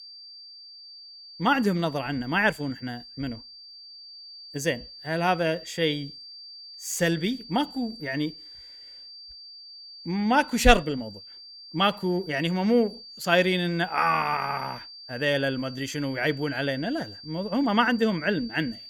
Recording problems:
high-pitched whine; noticeable; throughout; 4.5 kHz, 15 dB below the speech

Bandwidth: 18 kHz